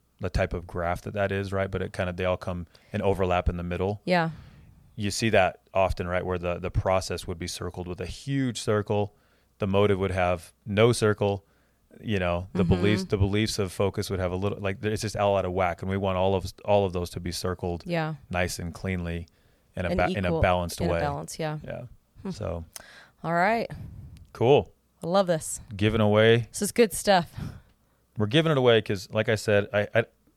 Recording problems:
none

